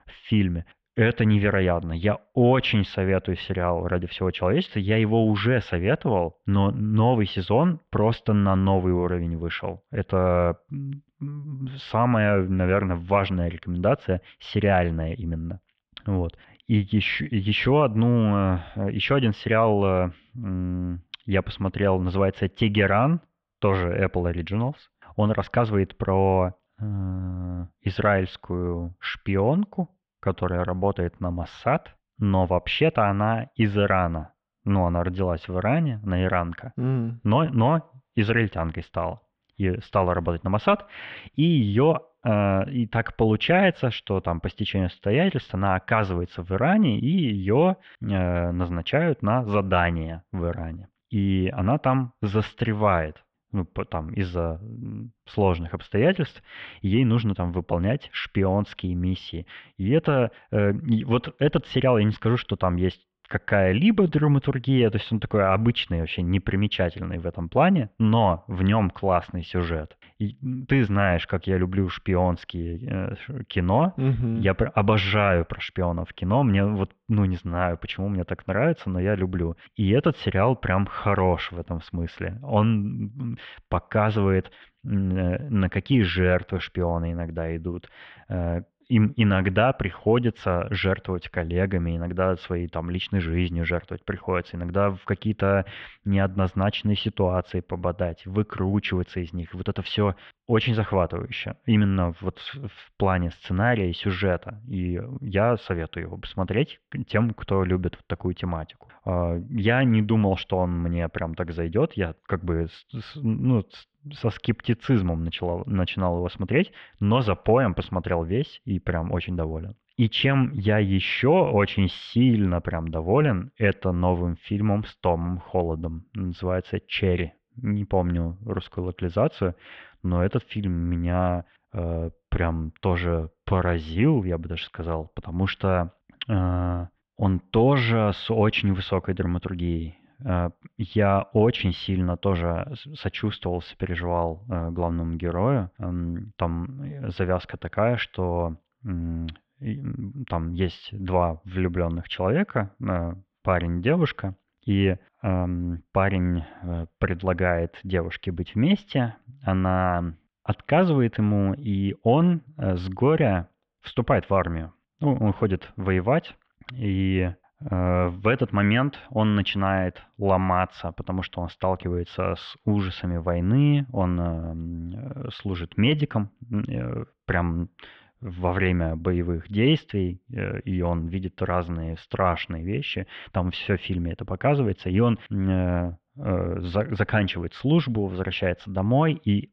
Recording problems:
muffled; very; fading above 3.5 kHz

